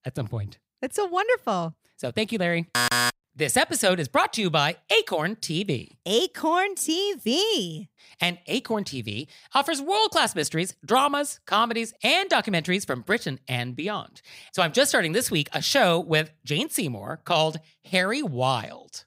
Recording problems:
none

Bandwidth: 15.5 kHz